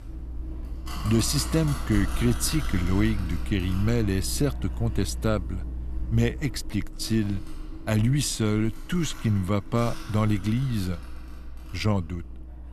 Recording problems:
household noises; loud; throughout; 10 dB below the speech

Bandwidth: 13.5 kHz